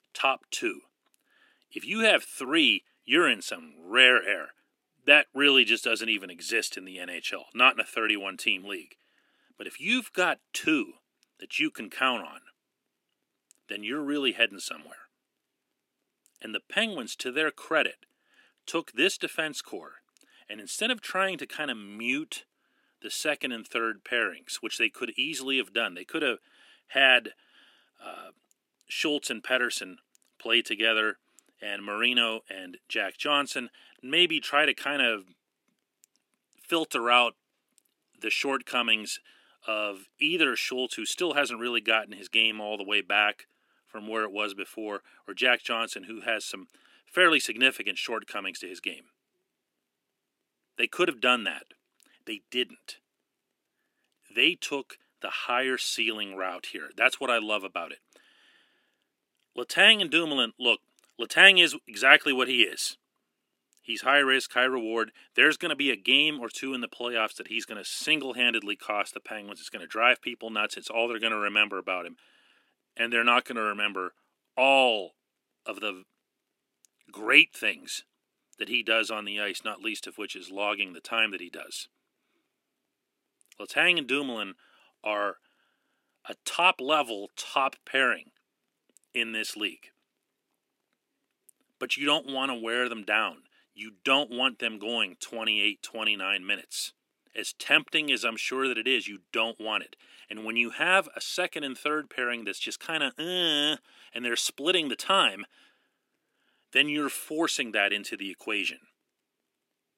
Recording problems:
thin; very slightly; fading below 300 Hz

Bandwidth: 16 kHz